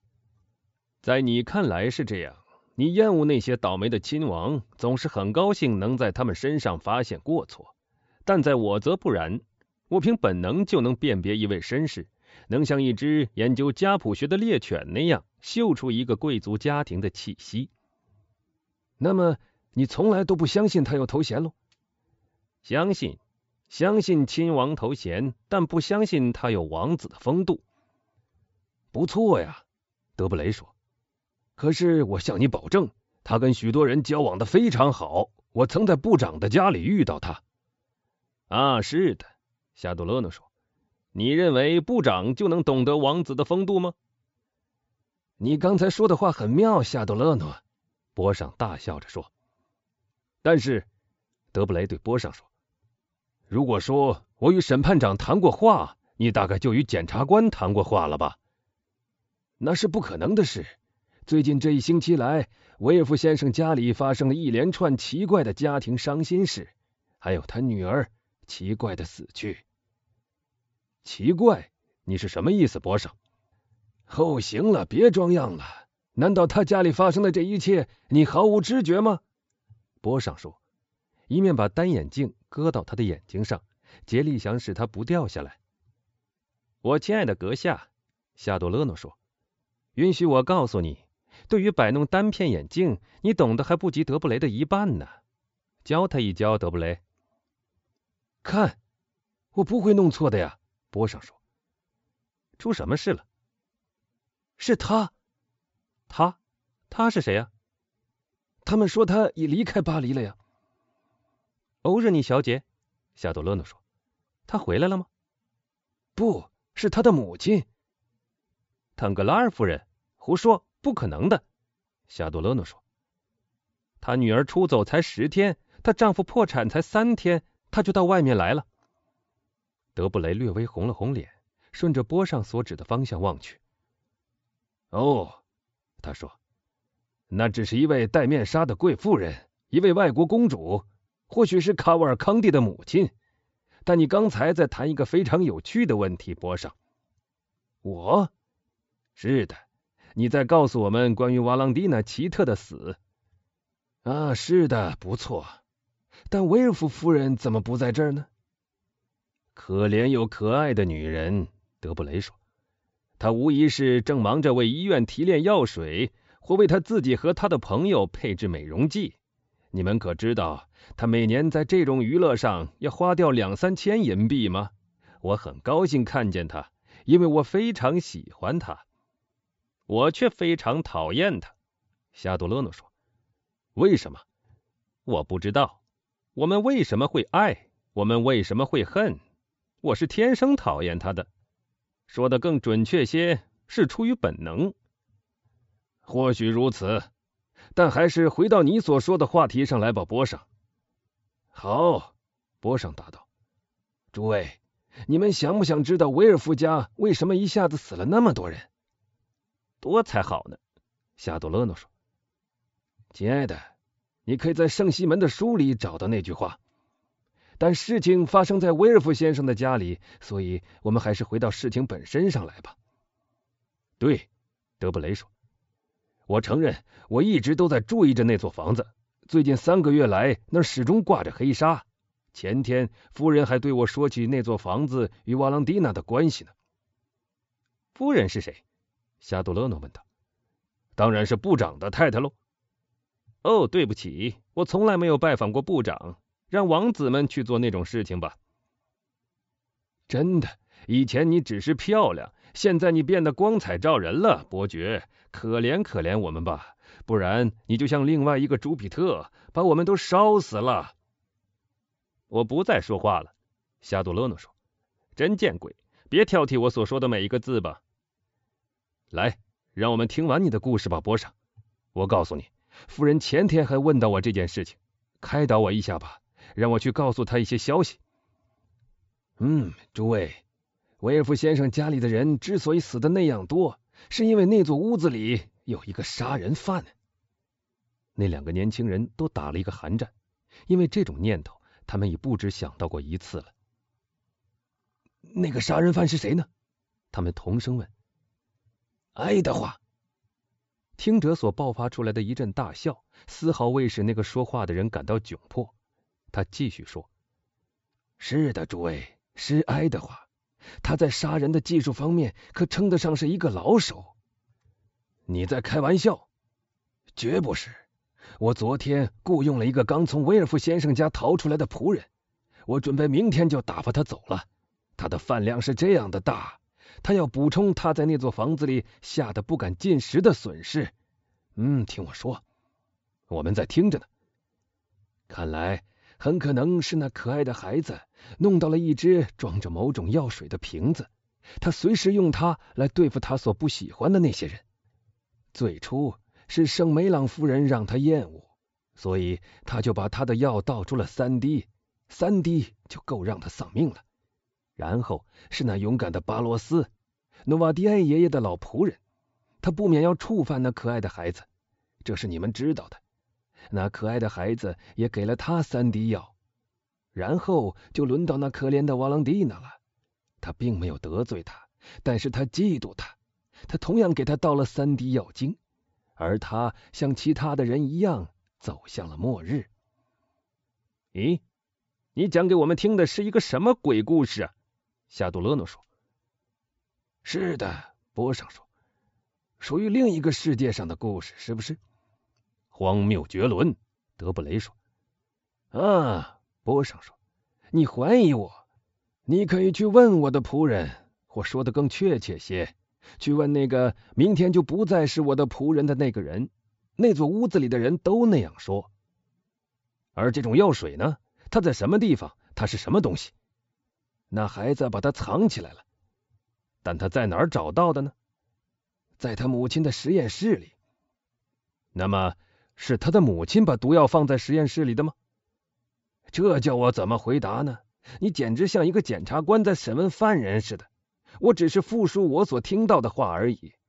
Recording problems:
high frequencies cut off; noticeable; nothing above 8 kHz

